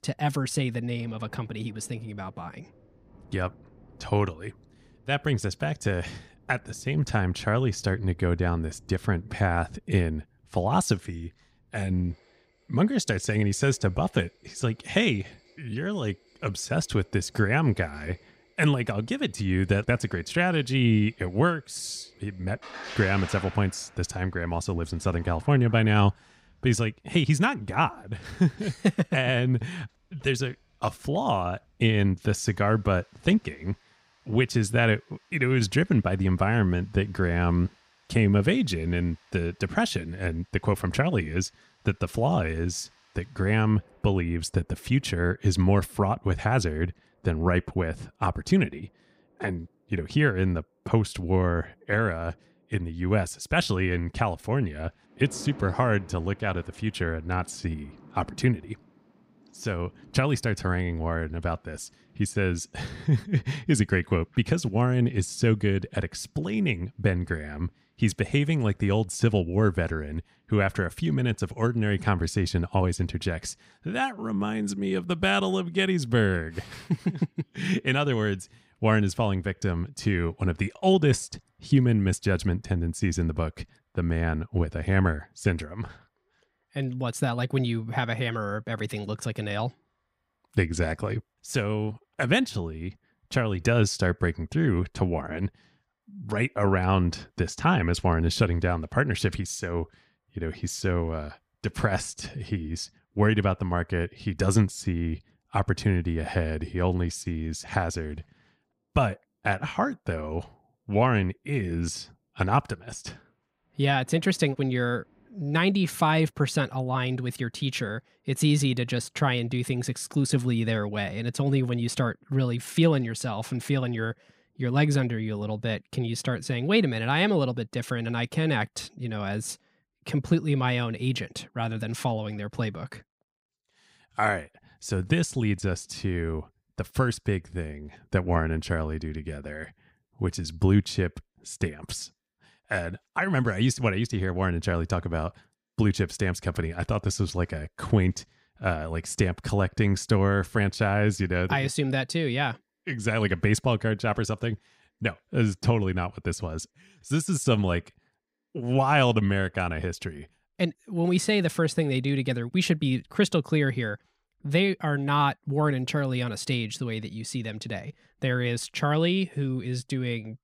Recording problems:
rain or running water; faint; throughout; 25 dB below the speech

